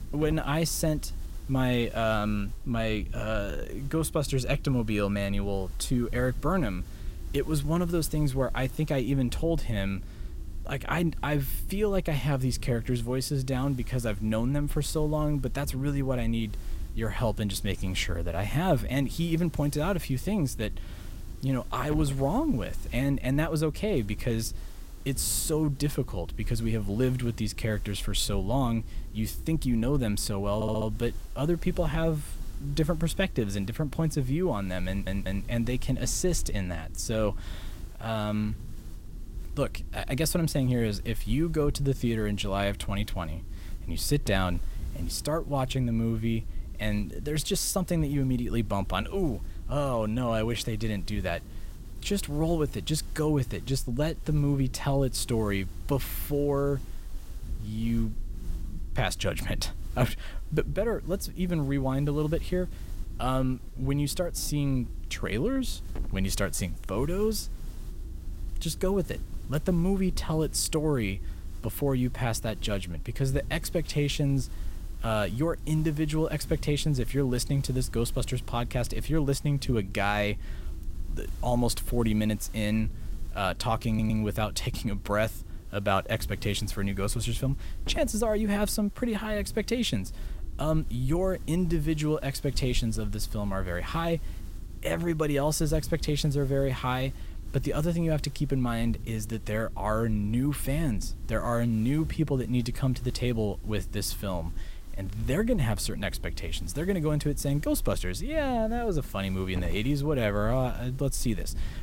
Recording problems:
hiss; faint; throughout; 25 dB below the speech
low rumble; faint; throughout; 25 dB below the speech
audio stuttering; at 31 s, at 35 s and at 1:24

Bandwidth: 16 kHz